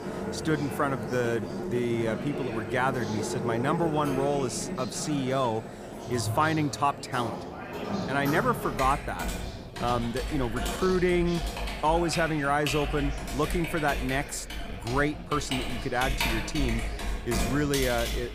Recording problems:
household noises; loud; throughout; 5 dB below the speech
chatter from many people; noticeable; throughout; 15 dB below the speech
uneven, jittery; strongly; from 1 to 17 s

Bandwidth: 15 kHz